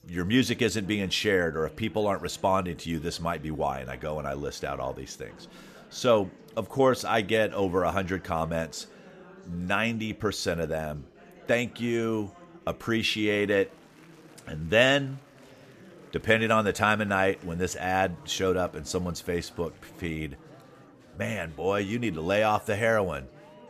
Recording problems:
chatter from many people; faint; throughout; 25 dB below the speech

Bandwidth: 14.5 kHz